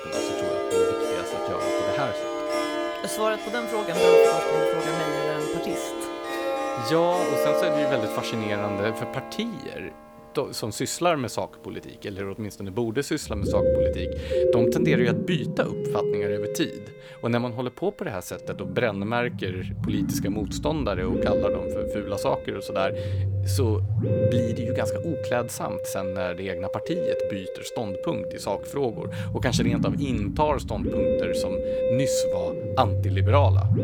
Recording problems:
background music; very loud; throughout; 3 dB above the speech

